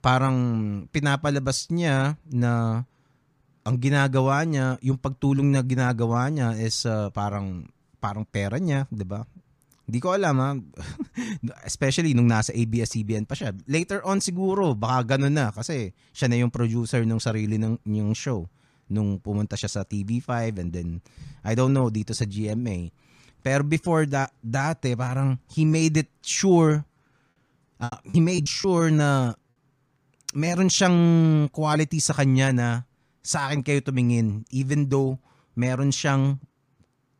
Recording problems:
choppy; very; from 26 to 29 s; 10% of the speech affected

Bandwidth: 15 kHz